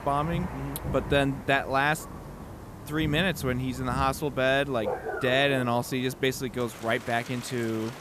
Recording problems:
rain or running water; noticeable; throughout; 10 dB below the speech

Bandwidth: 14.5 kHz